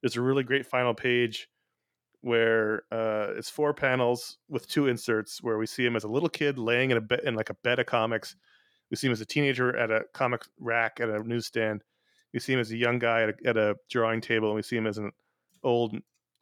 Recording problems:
none

